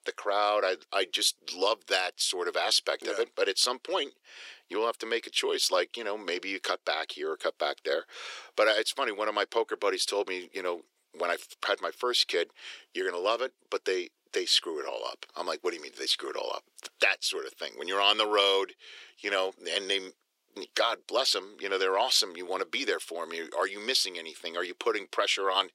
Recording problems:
thin; very; fading below 350 Hz

